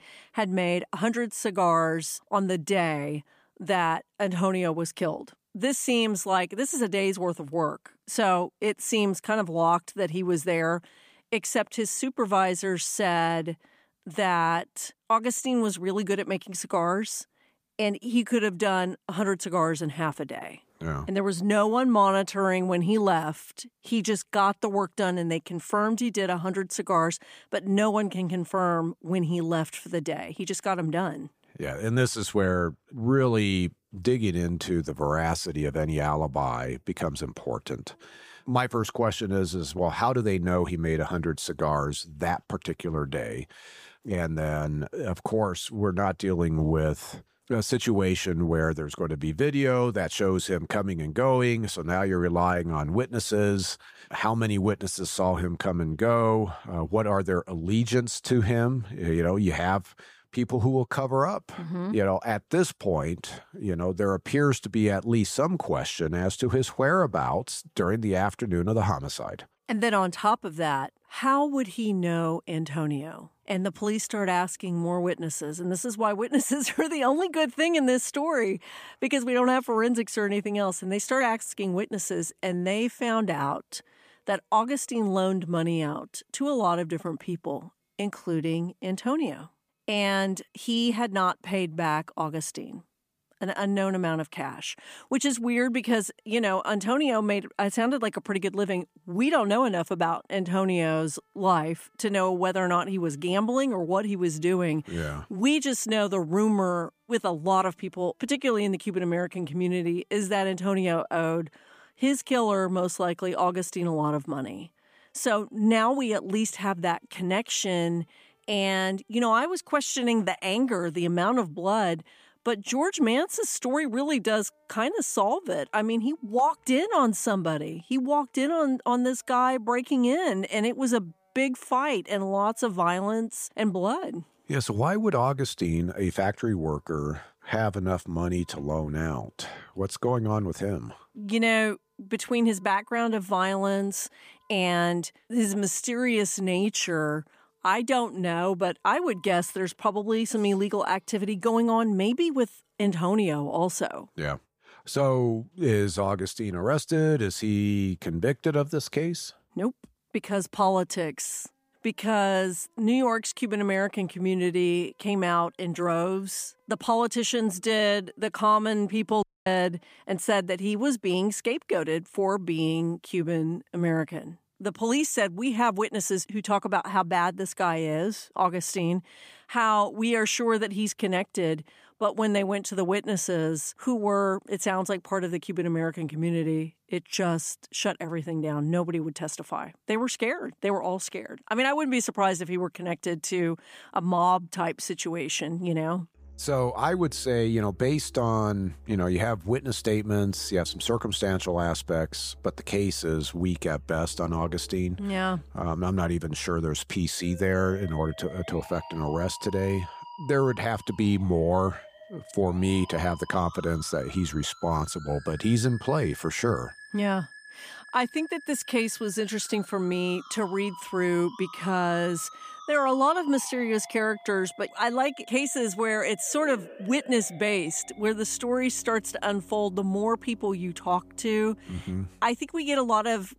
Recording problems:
background music; faint; throughout; 20 dB below the speech
audio cutting out; at 2:49

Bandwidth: 15 kHz